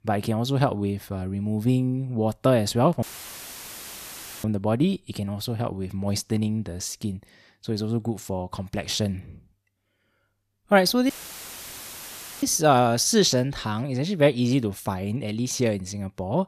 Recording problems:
audio cutting out; filled with static; at 3 s for 1.5 s and at 11 s for 1.5 s

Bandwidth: 14.5 kHz